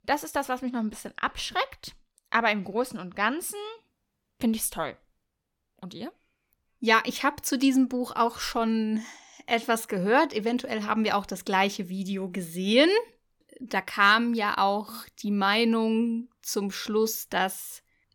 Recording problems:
none

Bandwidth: 18 kHz